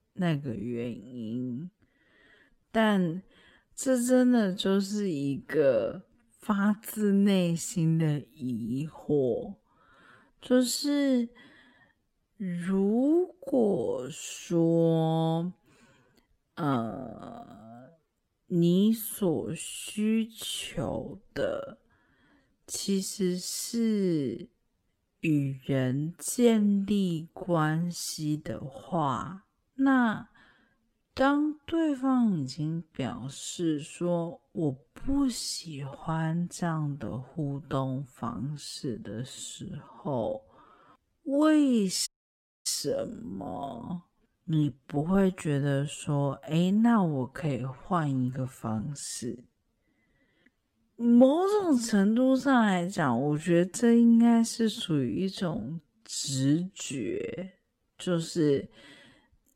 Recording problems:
wrong speed, natural pitch; too slow; 0.5 times normal speed
audio cutting out; at 42 s for 0.5 s

